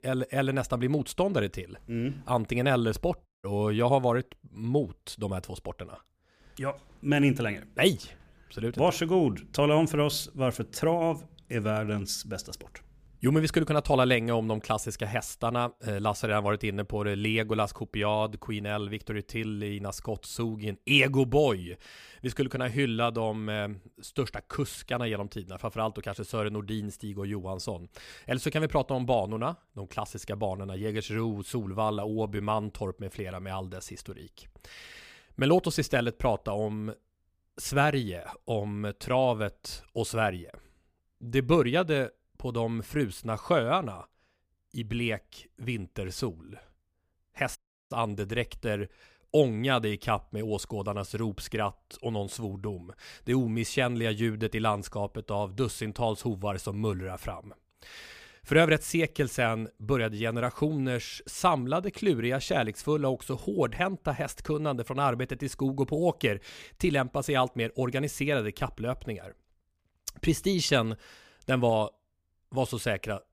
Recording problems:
audio cutting out; at 3.5 s and at 48 s

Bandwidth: 15 kHz